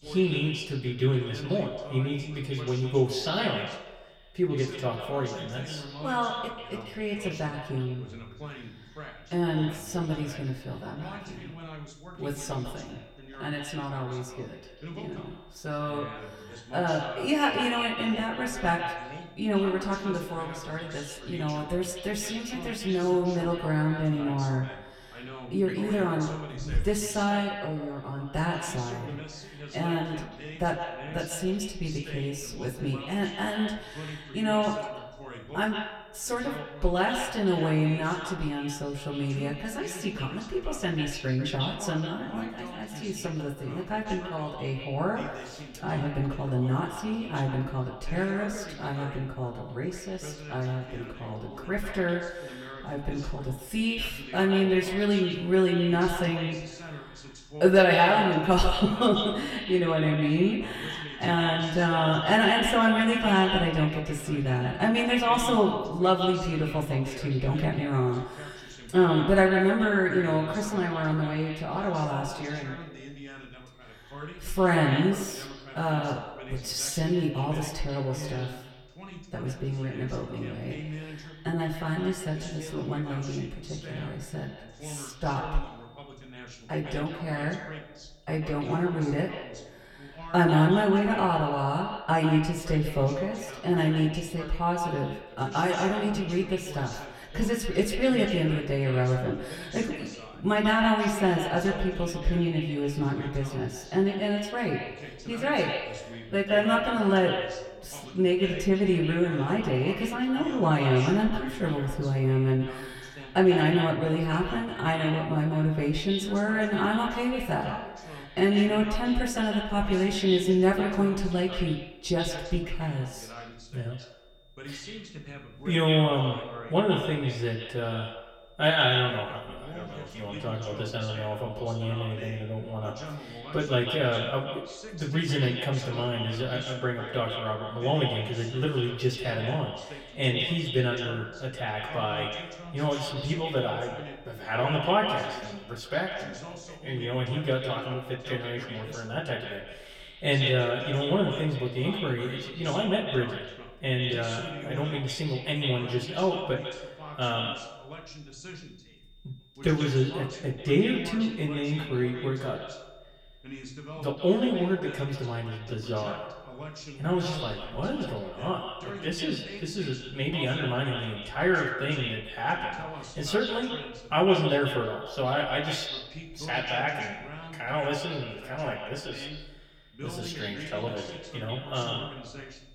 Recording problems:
echo of what is said; strong; throughout; 140 ms later, 8 dB below the speech
off-mic speech; far
room echo; very slight; dies away in 0.2 s
voice in the background; noticeable; throughout; 15 dB below the speech
high-pitched whine; faint; throughout; 3.5 kHz, 35 dB below the speech

